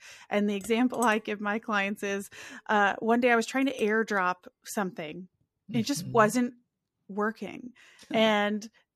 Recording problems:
household noises; noticeable; throughout; 20 dB below the speech

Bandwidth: 14.5 kHz